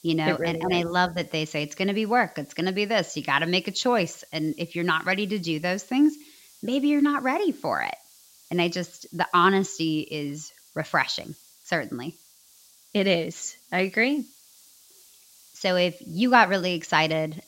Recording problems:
high frequencies cut off; noticeable; nothing above 8 kHz
hiss; faint; throughout; 25 dB below the speech

